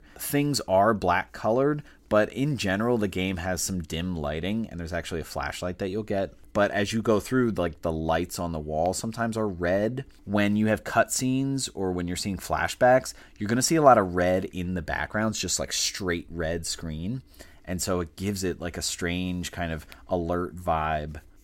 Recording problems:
none

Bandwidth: 16 kHz